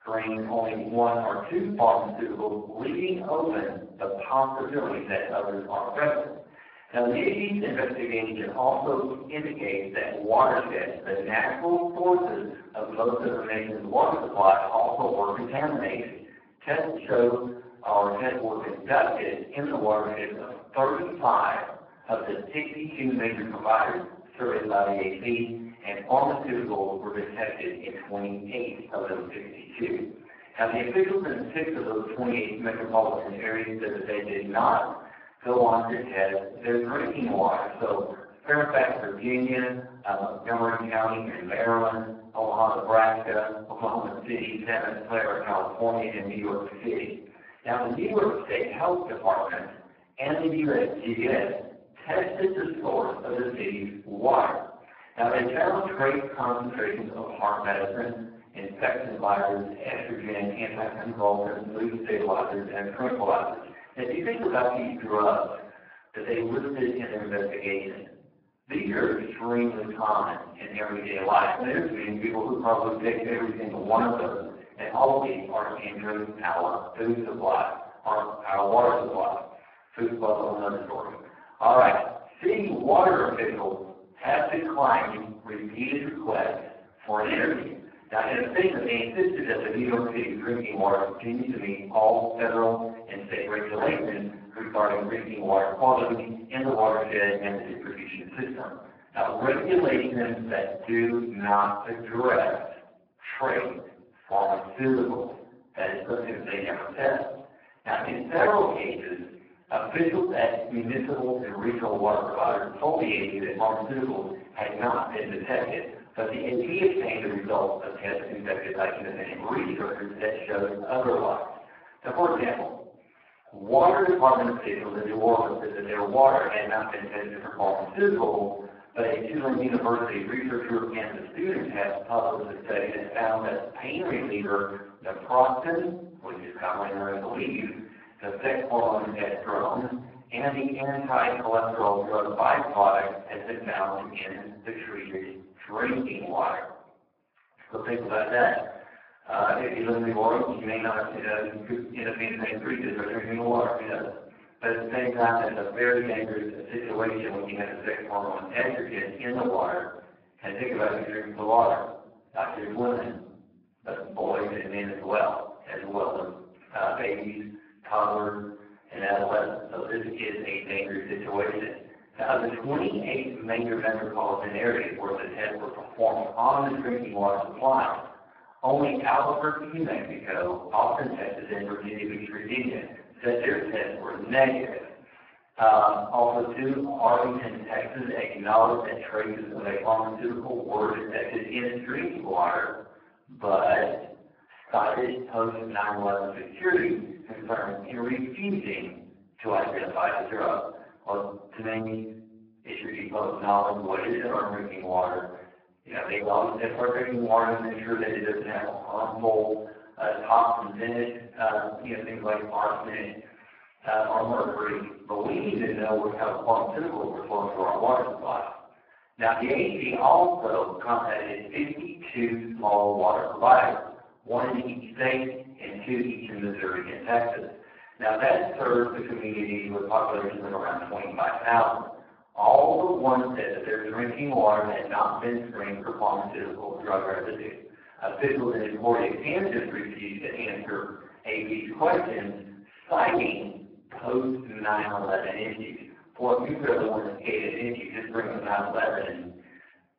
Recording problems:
off-mic speech; far
garbled, watery; badly; nothing above 5 kHz
thin; very; fading below 600 Hz
room echo; noticeable; dies away in 0.7 s

